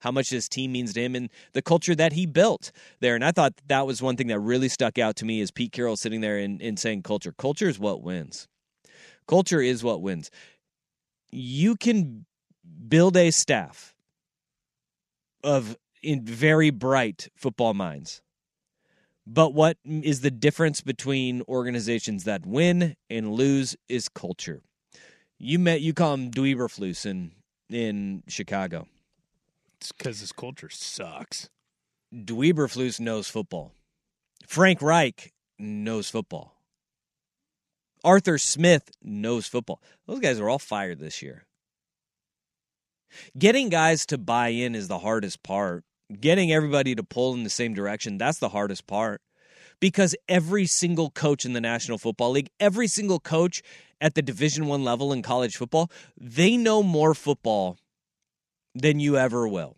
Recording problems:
none

